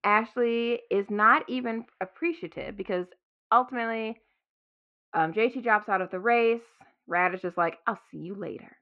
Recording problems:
muffled; very; fading above 2.5 kHz

